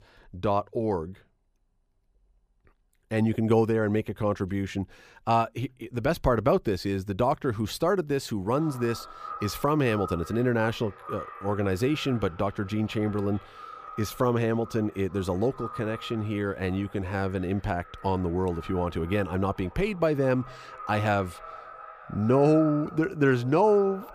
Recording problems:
echo of what is said; noticeable; from 8.5 s on; 440 ms later, 15 dB below the speech

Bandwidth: 15 kHz